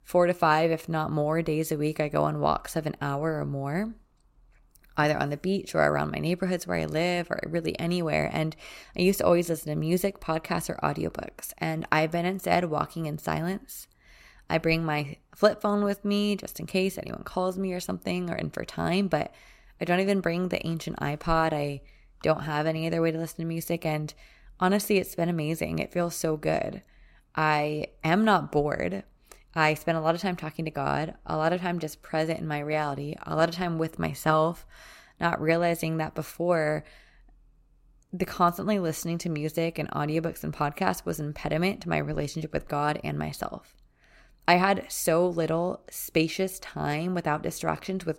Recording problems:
none

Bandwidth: 16 kHz